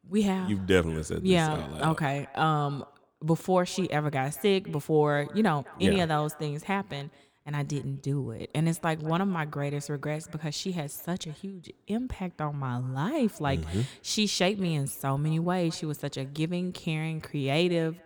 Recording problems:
echo of what is said; faint; throughout; 200 ms later, 25 dB below the speech

